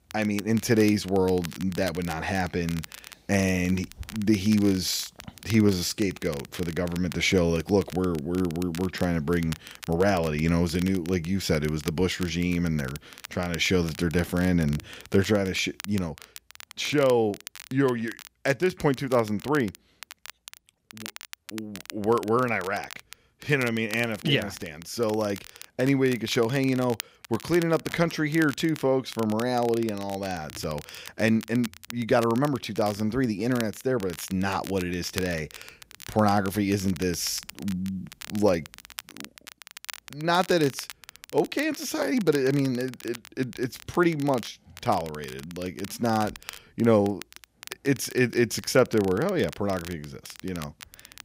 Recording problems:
crackle, like an old record; noticeable; 15 dB below the speech

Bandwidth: 15.5 kHz